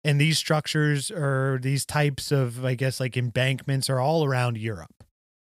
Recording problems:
none

